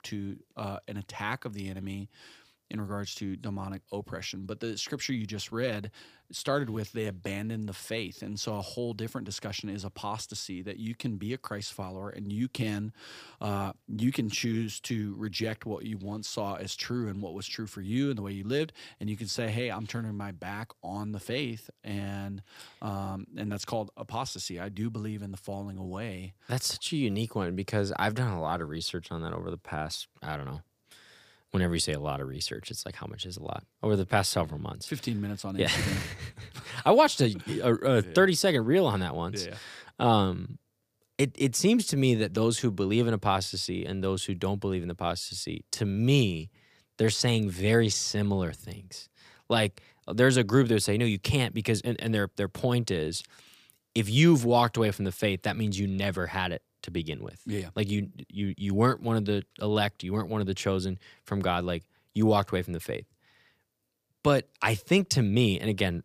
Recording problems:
none

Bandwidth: 15 kHz